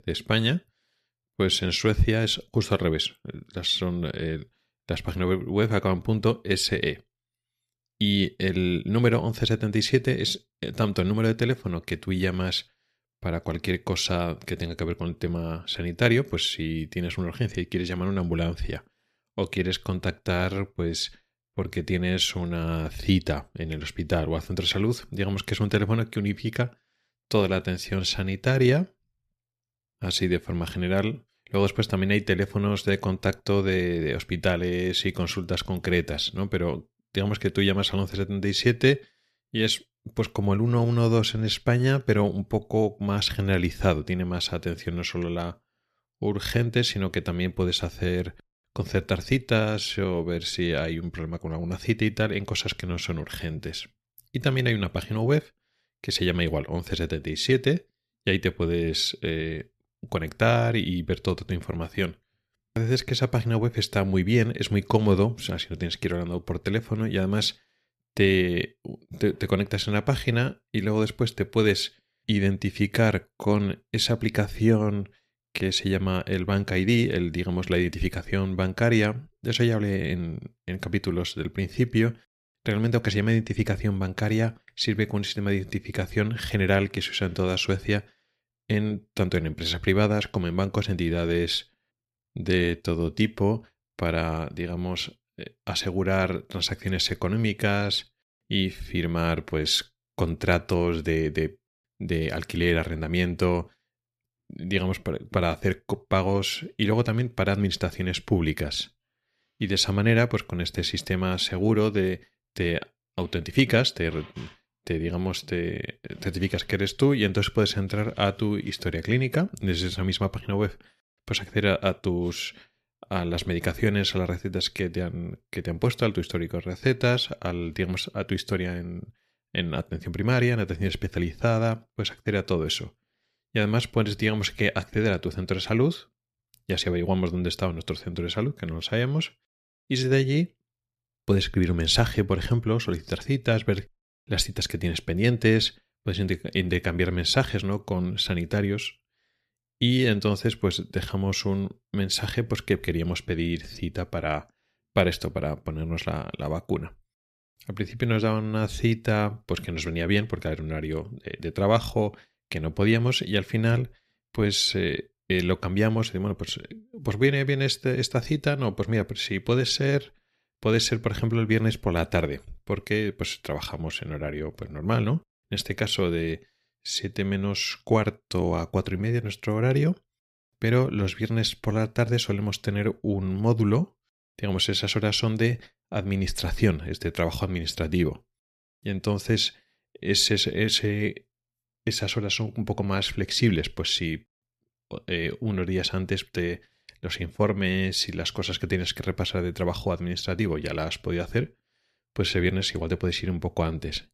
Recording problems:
none

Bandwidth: 14.5 kHz